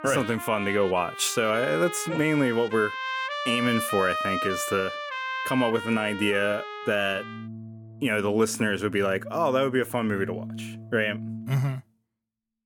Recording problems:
background music; loud; throughout; 8 dB below the speech

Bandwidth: 18.5 kHz